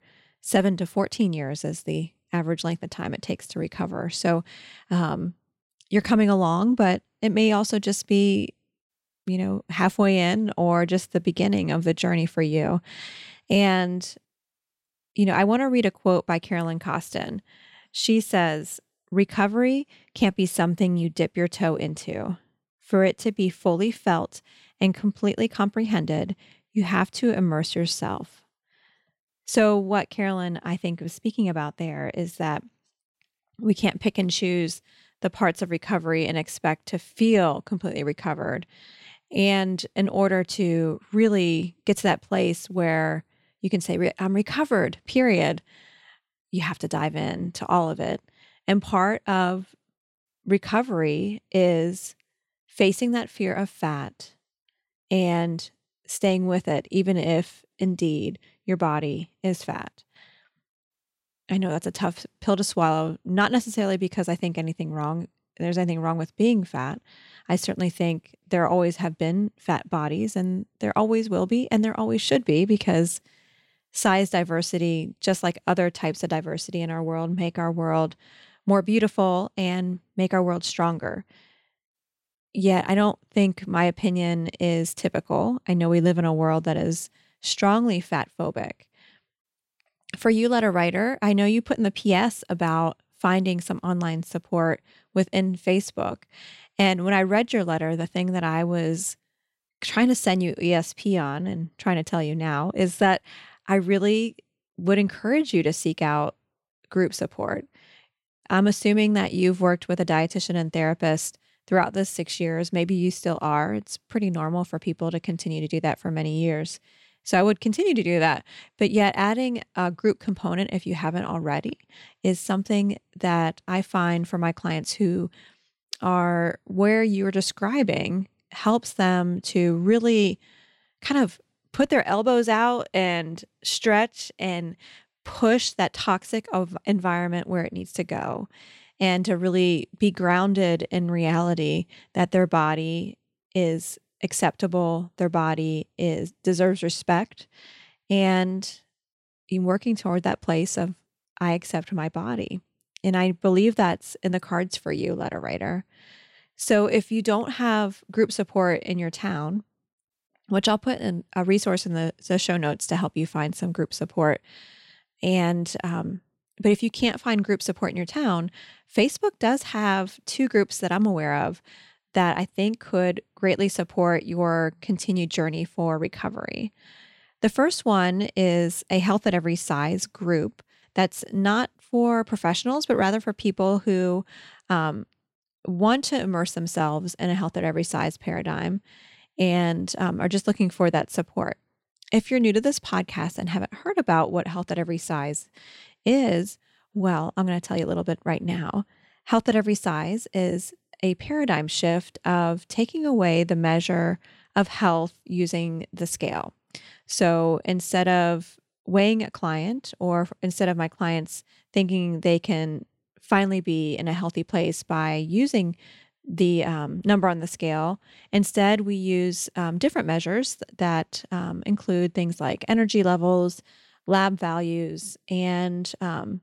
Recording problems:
none

